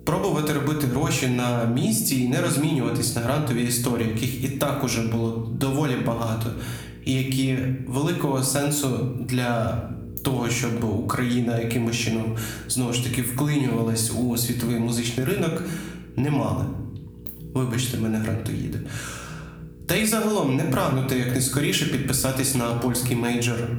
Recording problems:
room echo; slight; dies away in 0.6 s
off-mic speech; somewhat distant
squashed, flat; somewhat
electrical hum; faint; throughout; 60 Hz, 25 dB below the speech

